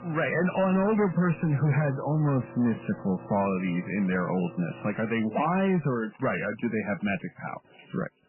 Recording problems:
garbled, watery; badly; nothing above 2.5 kHz
distortion; slight; 7% of the sound clipped
household noises; noticeable; throughout; 20 dB below the speech

